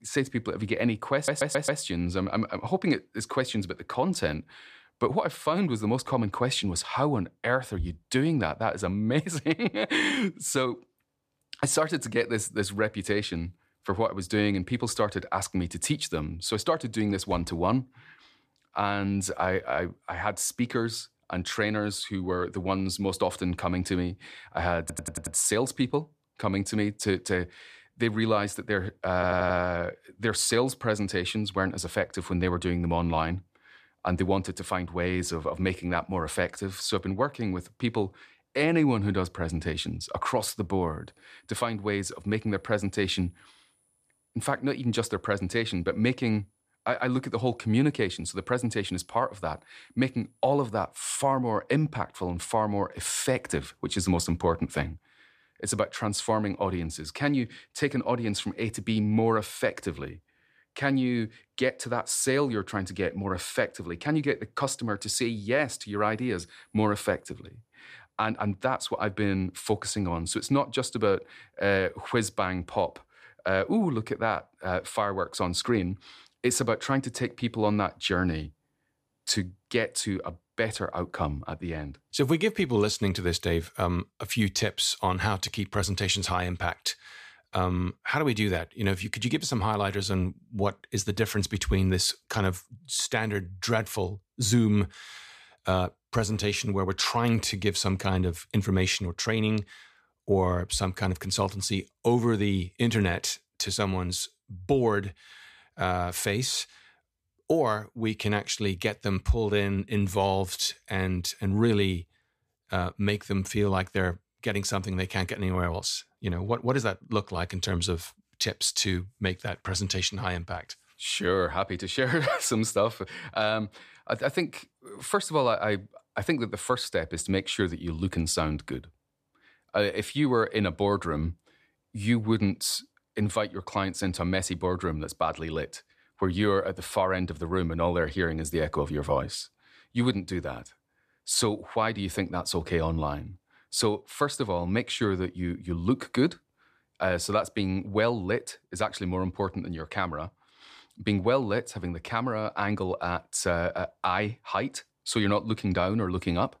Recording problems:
audio stuttering; at 1 s, at 25 s and at 29 s

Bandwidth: 14.5 kHz